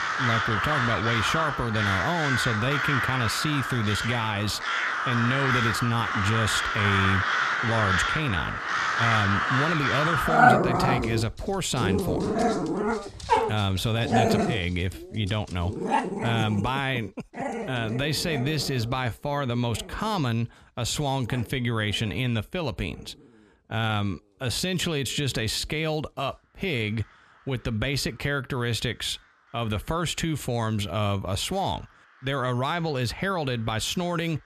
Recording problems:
animal sounds; very loud; throughout; 2 dB above the speech

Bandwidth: 14 kHz